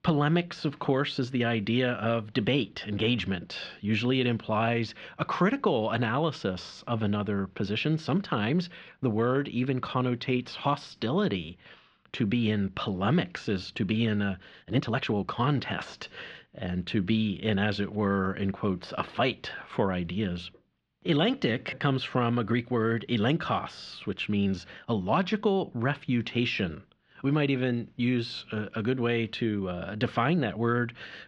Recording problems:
muffled; slightly; fading above 4 kHz
uneven, jittery; strongly; from 15 to 25 s

